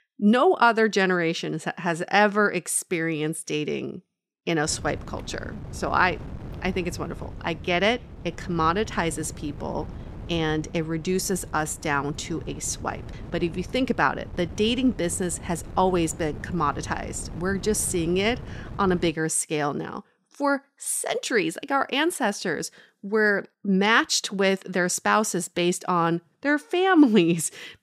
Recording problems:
wind noise on the microphone; occasional gusts; from 4.5 to 19 s; 20 dB below the speech

